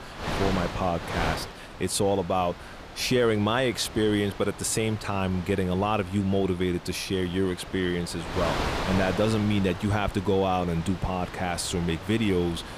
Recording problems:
wind noise on the microphone; heavy; 8 dB below the speech

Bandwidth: 15 kHz